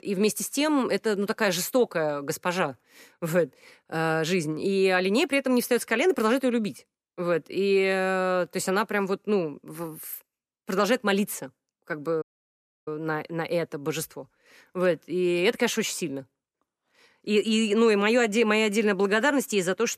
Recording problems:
audio cutting out; at 12 s for 0.5 s

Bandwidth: 14.5 kHz